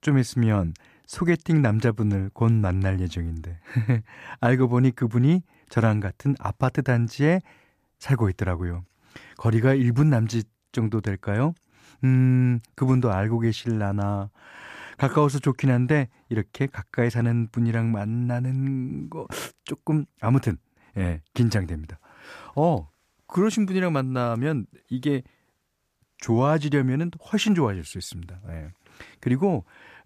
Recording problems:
none

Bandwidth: 14.5 kHz